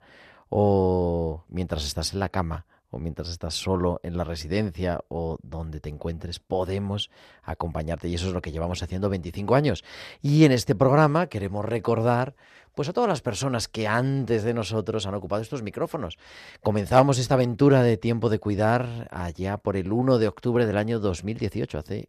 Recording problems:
none

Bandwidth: 14 kHz